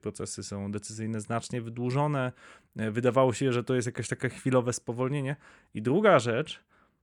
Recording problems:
none

